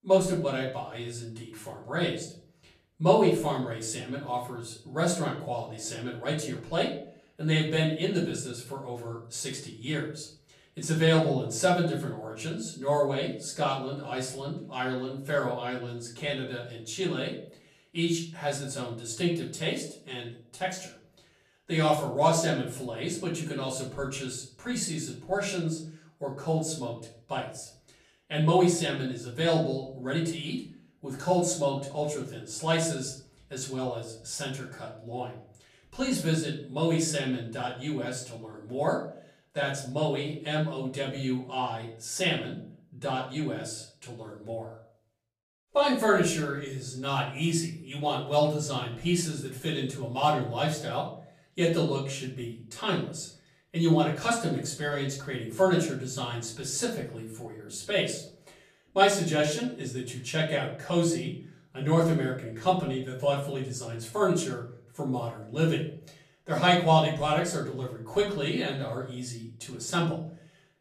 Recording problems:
off-mic speech; far
room echo; slight; dies away in 0.5 s

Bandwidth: 14.5 kHz